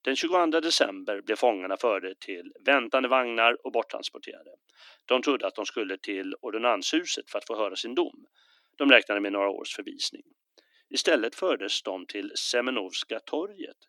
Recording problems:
thin; somewhat; fading below 300 Hz

